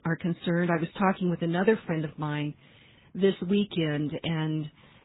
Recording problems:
garbled, watery; badly; nothing above 4 kHz
high frequencies cut off; slight

